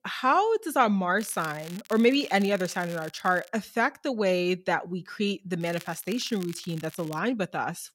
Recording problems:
crackling; noticeable; from 1 to 3.5 s and from 5.5 to 7 s; 20 dB below the speech

